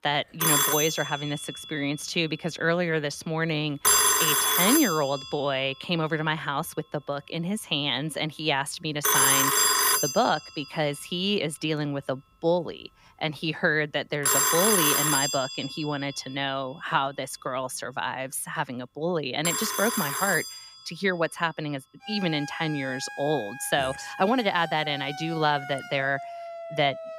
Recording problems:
alarms or sirens; very loud; throughout; 4 dB above the speech

